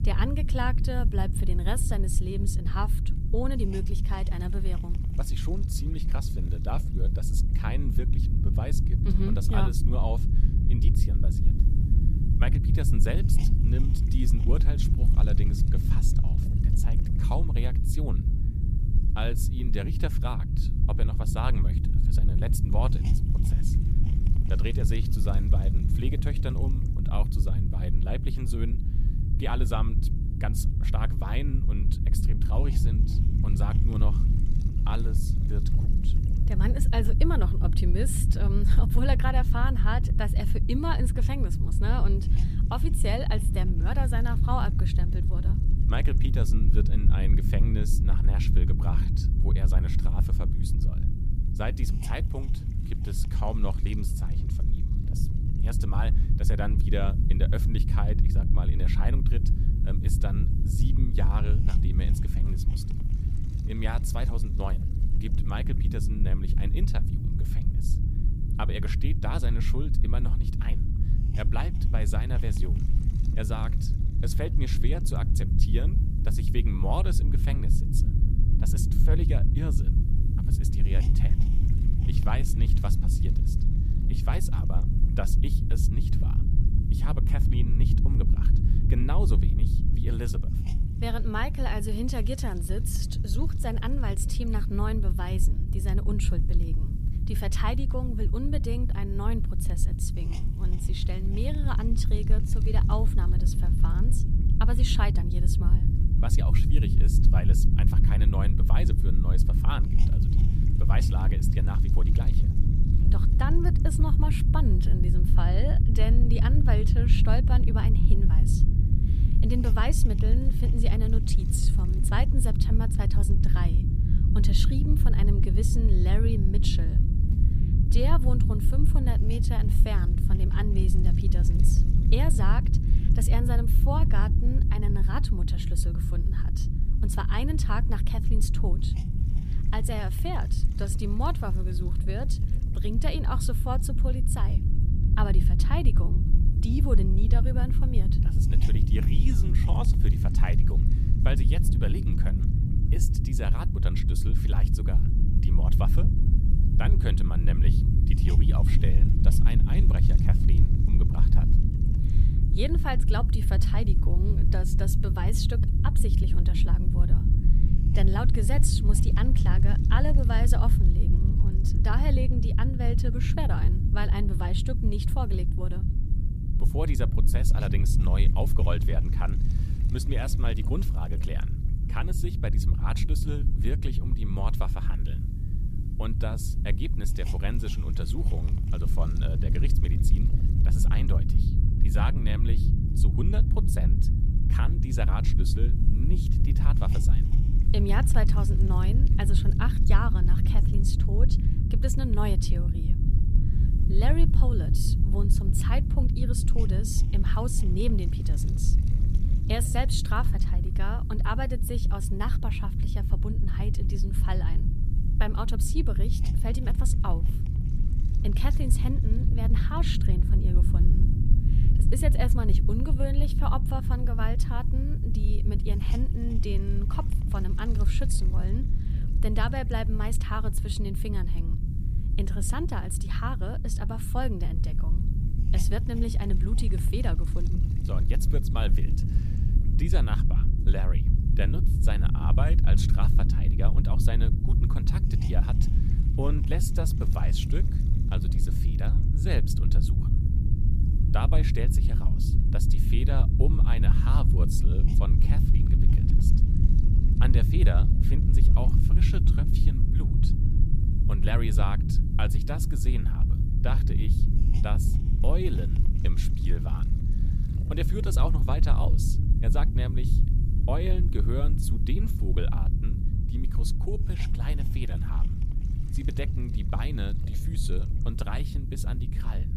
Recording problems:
low rumble; loud; throughout; 4 dB below the speech
hiss; faint; throughout; 25 dB below the speech

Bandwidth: 14.5 kHz